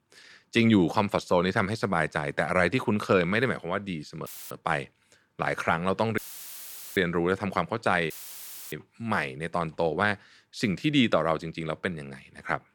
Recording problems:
audio cutting out; filled with static; at 4.5 s, at 6 s for 1 s and at 8 s for 0.5 s

